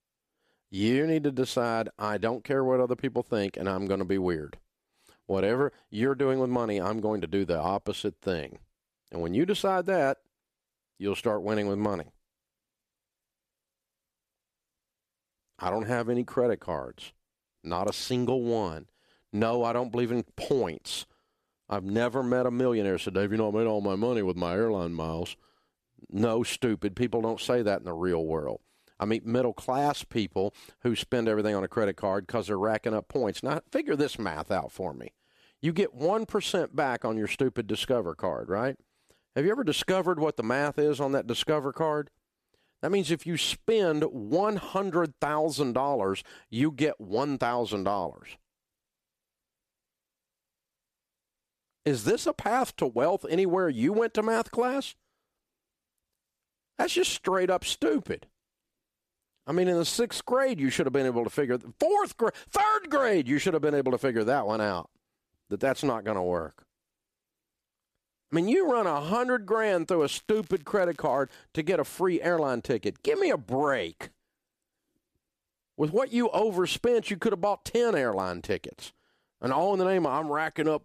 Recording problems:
crackling; faint; from 1:10 to 1:11; 30 dB below the speech

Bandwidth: 14.5 kHz